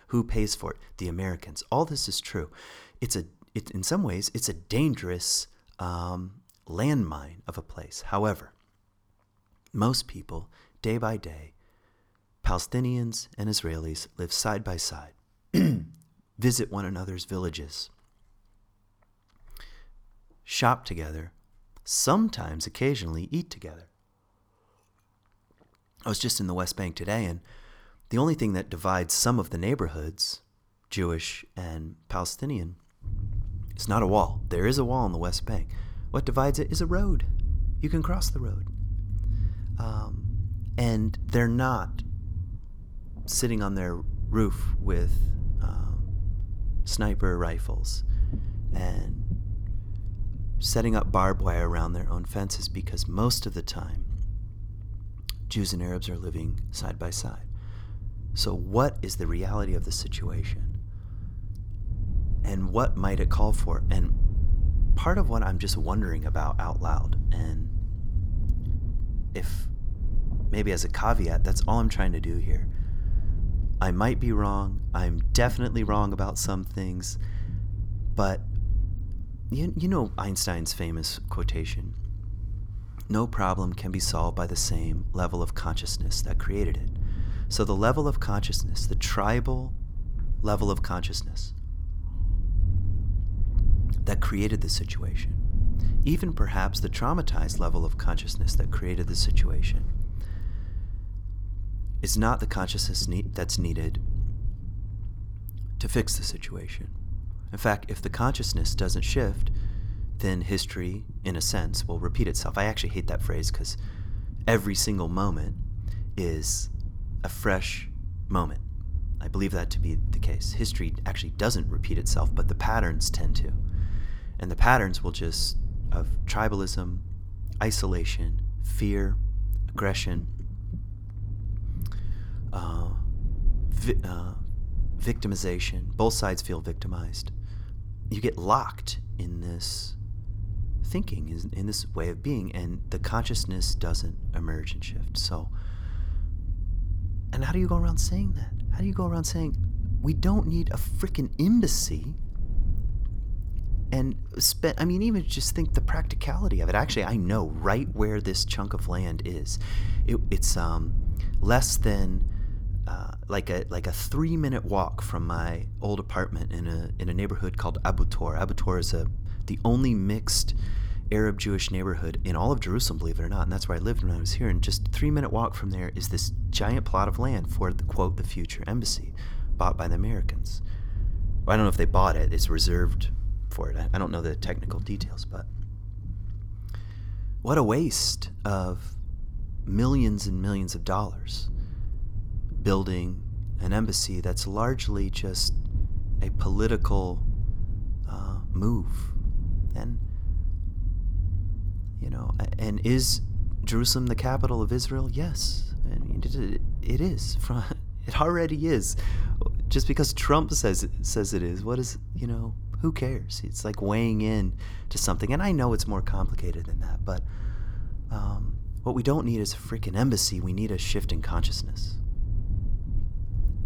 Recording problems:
low rumble; noticeable; from 33 s on; 20 dB below the speech

